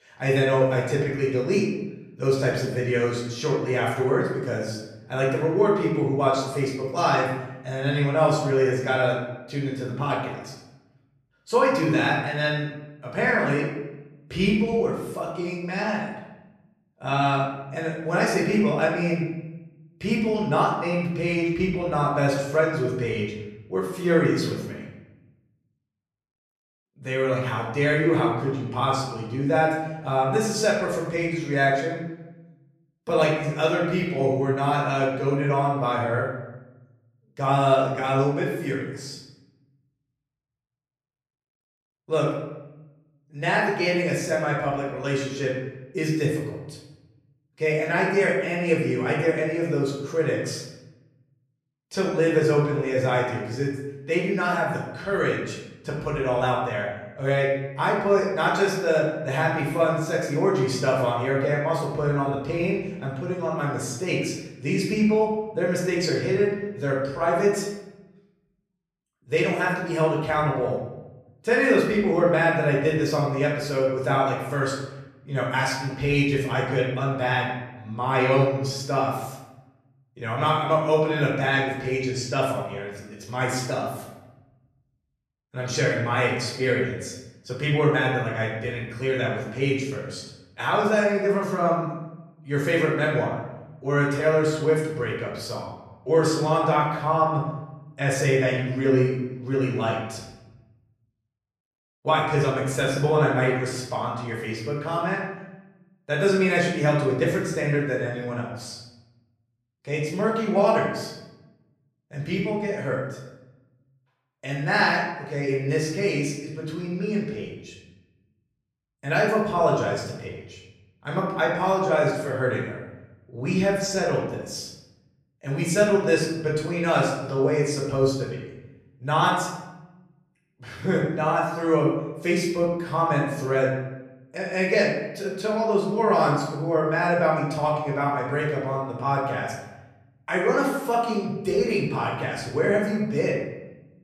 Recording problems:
off-mic speech; far
room echo; noticeable; dies away in 0.9 s

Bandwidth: 14.5 kHz